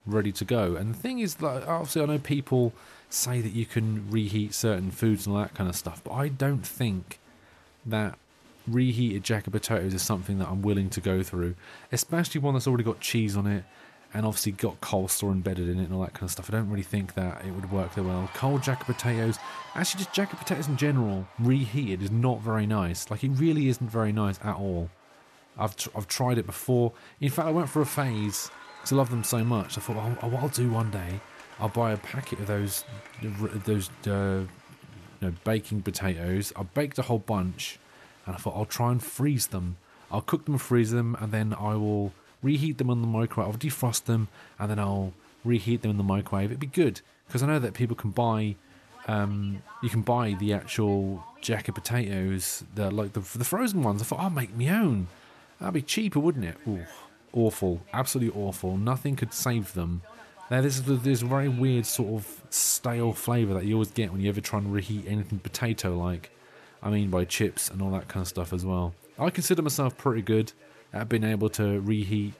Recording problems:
crowd noise; faint; throughout; 20 dB below the speech

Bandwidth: 13.5 kHz